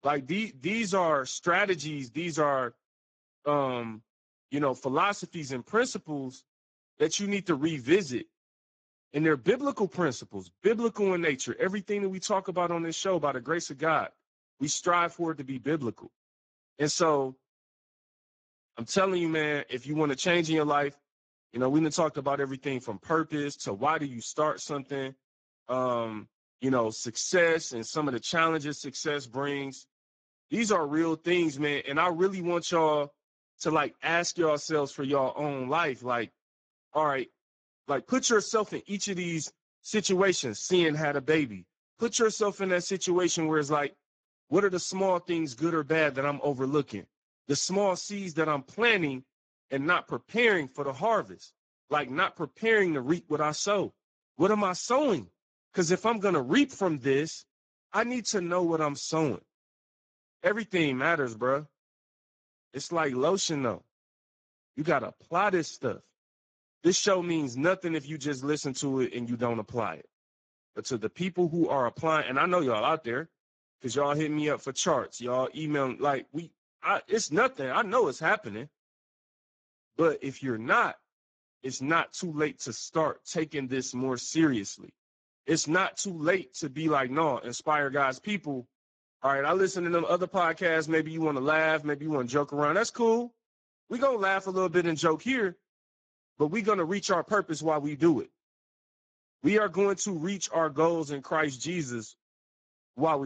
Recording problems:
garbled, watery; badly; nothing above 7.5 kHz
abrupt cut into speech; at the end

